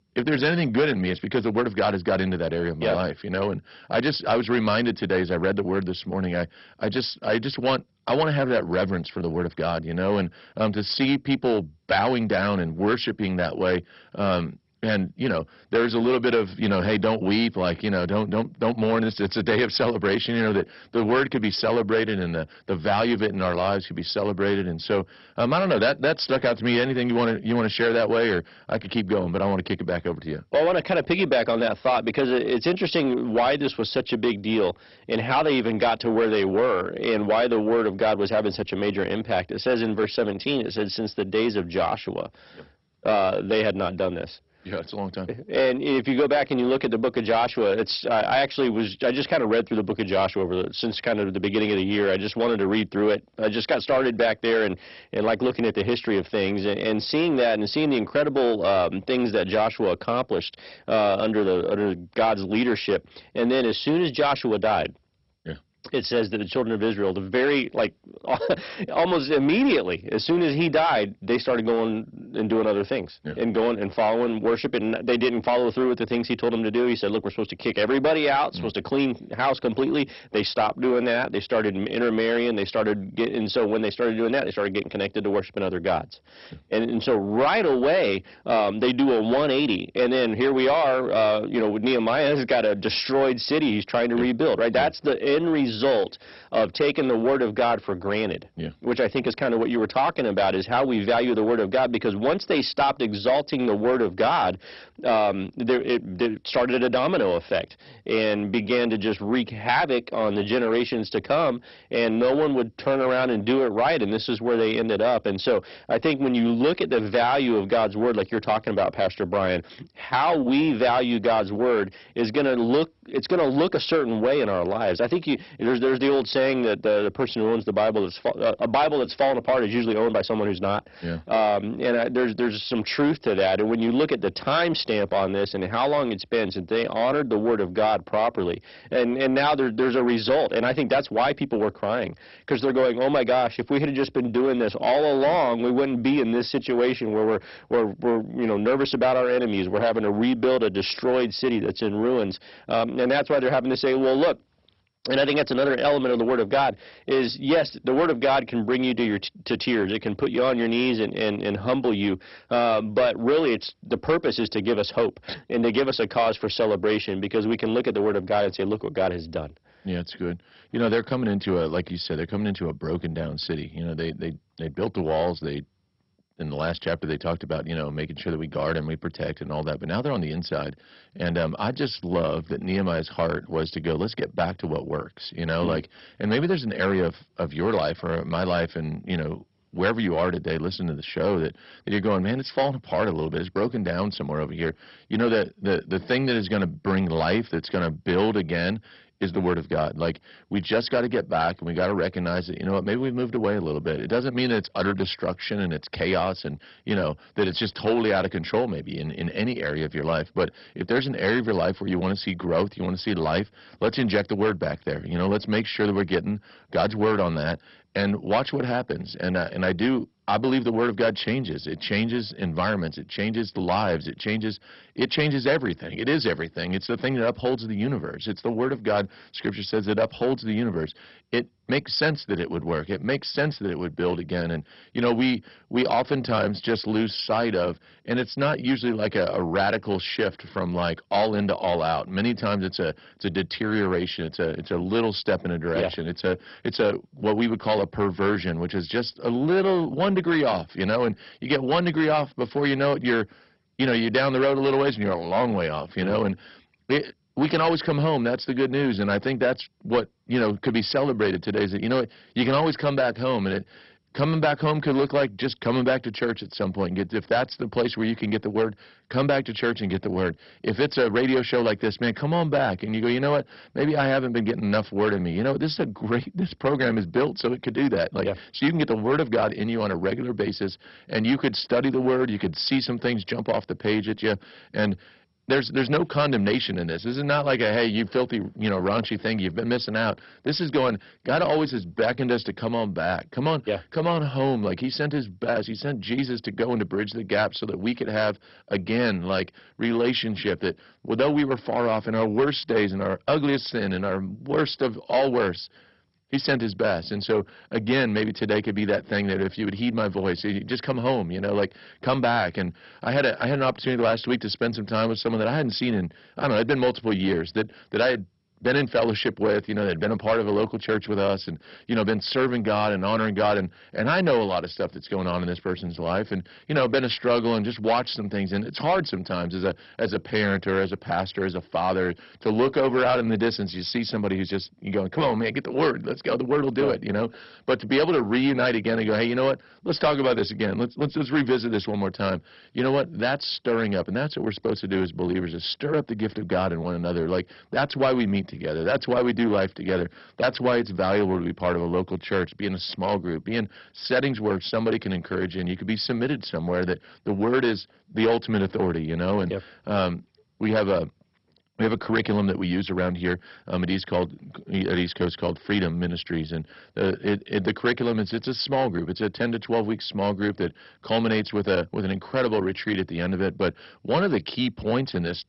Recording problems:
garbled, watery; badly; nothing above 5.5 kHz
distortion; slight; 10 dB below the speech

